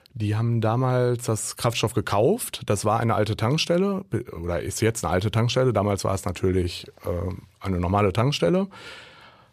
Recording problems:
none

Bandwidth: 14.5 kHz